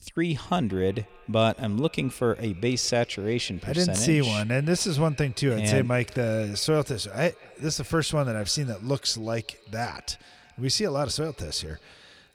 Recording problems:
echo of what is said; faint; throughout; 180 ms later, 25 dB below the speech

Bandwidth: 19 kHz